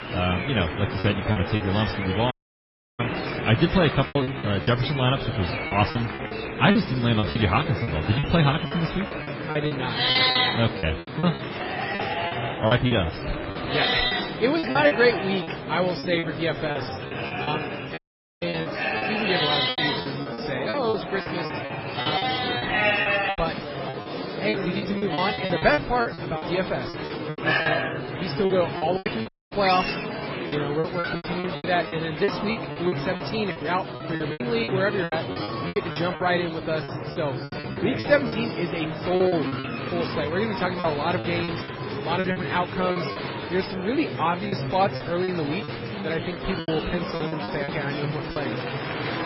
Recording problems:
garbled, watery; badly; nothing above 5.5 kHz
animal sounds; loud; throughout; 1 dB below the speech
murmuring crowd; loud; throughout; 5 dB below the speech
choppy; very; 12% of the speech affected
audio cutting out; at 2.5 s for 0.5 s, at 18 s and at 29 s

